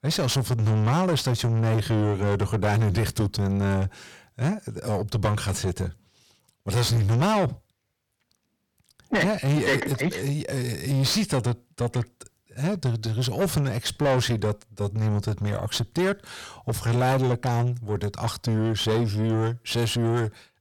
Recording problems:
distortion; heavy; 6 dB below the speech

